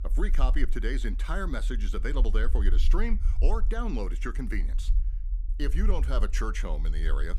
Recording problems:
low rumble; noticeable; throughout; 15 dB below the speech

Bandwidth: 15 kHz